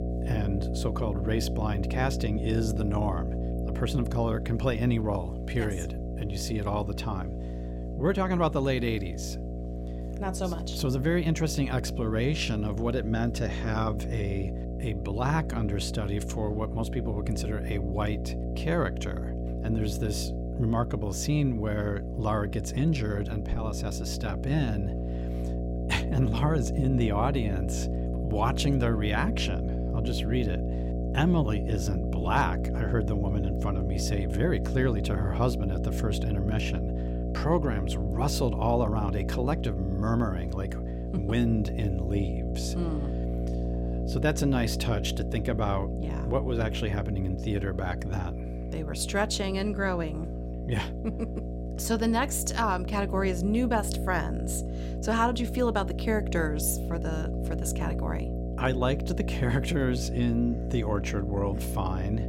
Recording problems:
electrical hum; loud; throughout; 60 Hz, 8 dB below the speech

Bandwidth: 16 kHz